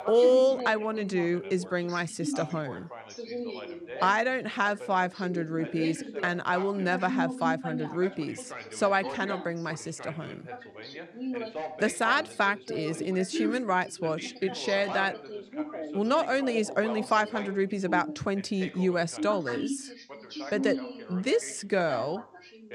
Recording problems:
background chatter; loud; throughout; 2 voices, 9 dB below the speech

